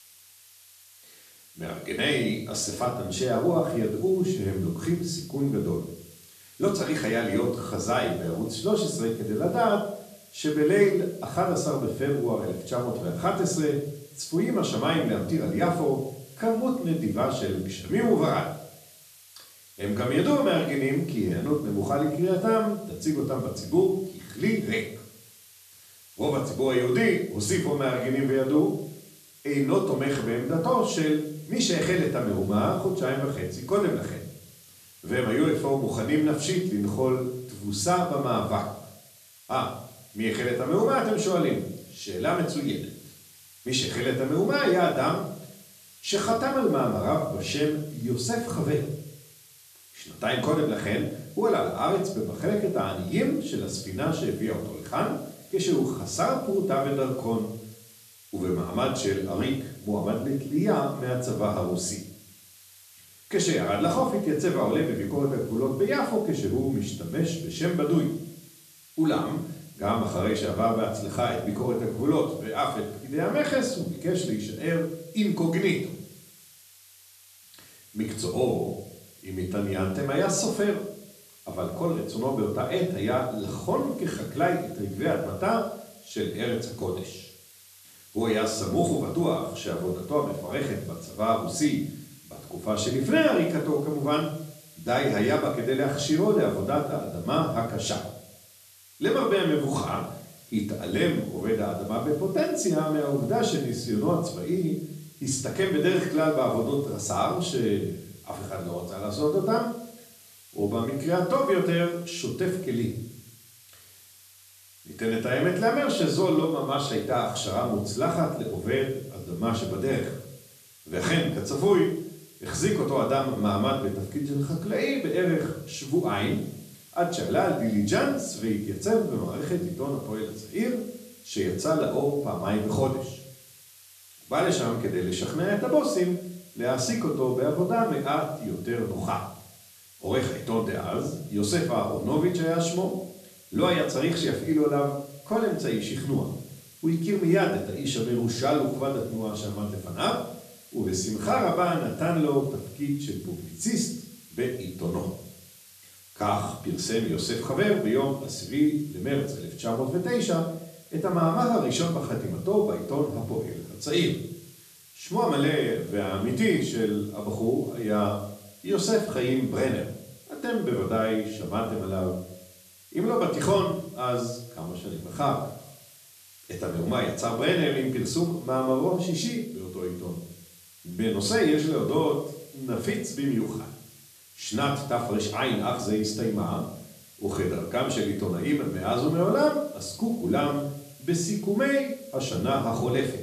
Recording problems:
off-mic speech; far
room echo; slight; dies away in 0.5 s
hiss; faint; throughout; 25 dB below the speech

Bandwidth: 14 kHz